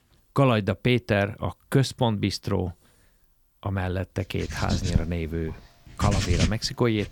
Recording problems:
household noises; loud; from 4.5 s on; 1 dB below the speech

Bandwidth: 17.5 kHz